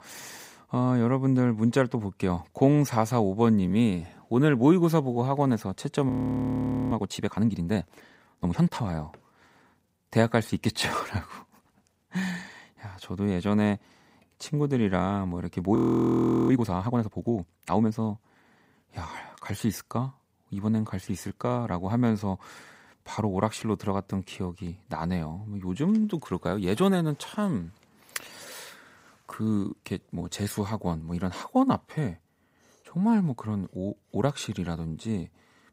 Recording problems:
audio freezing; at 6 s for 1 s and at 16 s for 0.5 s

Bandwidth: 15.5 kHz